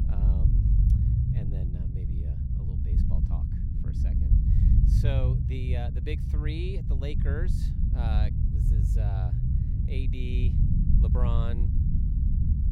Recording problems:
low rumble; loud; throughout; as loud as the speech

